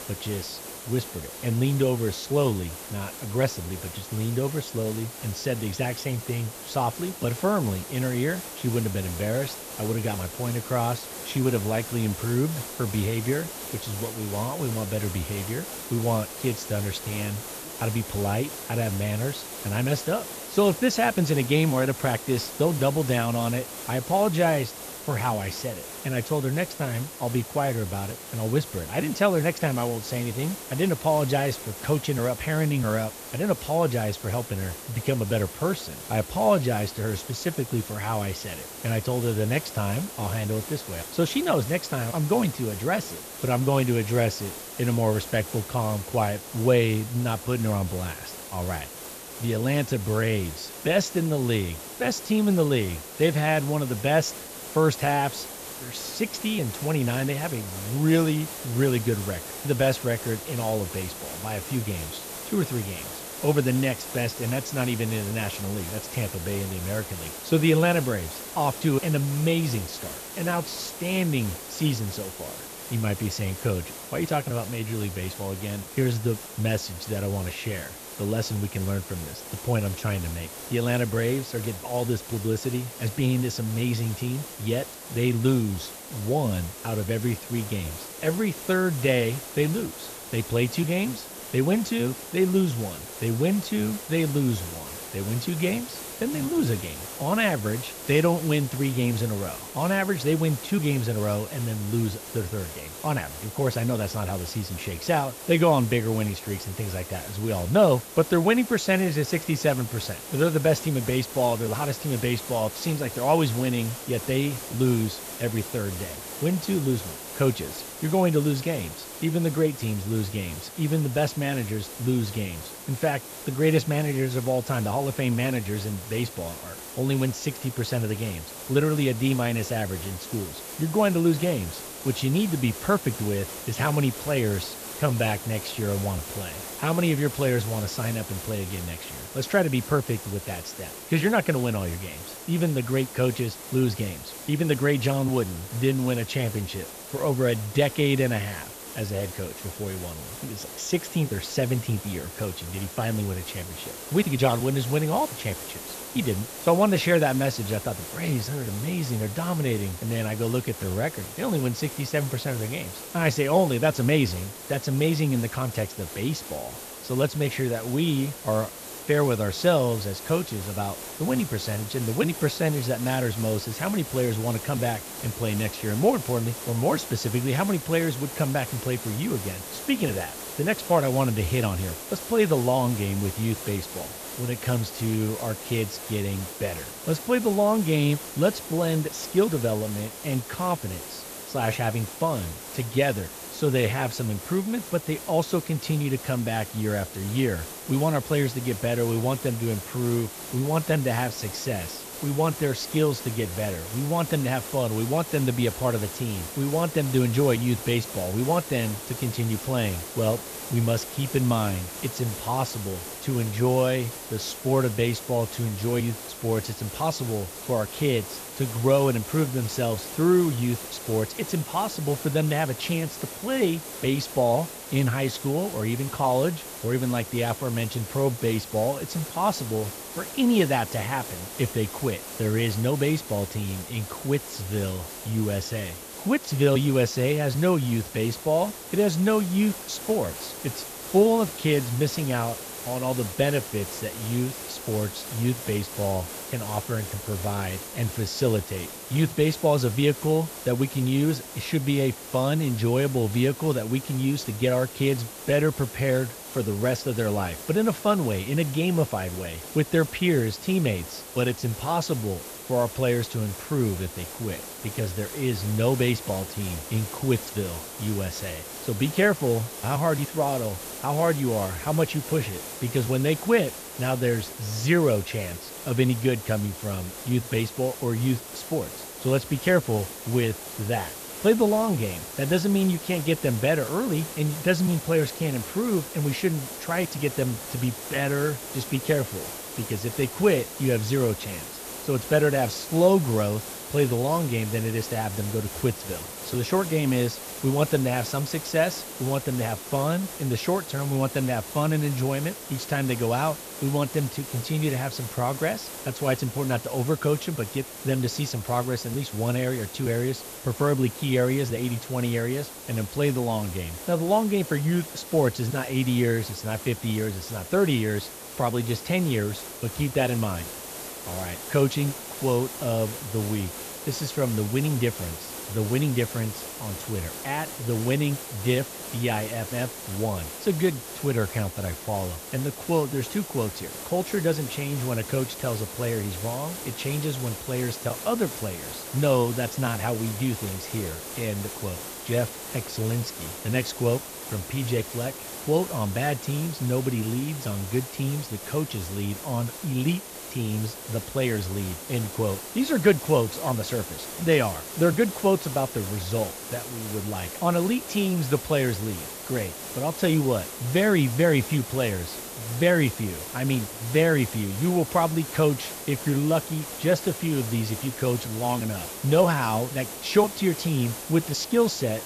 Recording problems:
high frequencies cut off; noticeable; nothing above 8 kHz
hiss; loud; throughout; 10 dB below the speech

